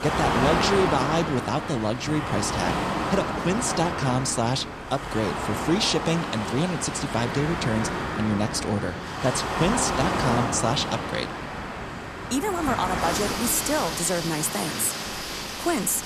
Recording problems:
rain or running water; loud; throughout; 2 dB below the speech

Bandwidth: 14 kHz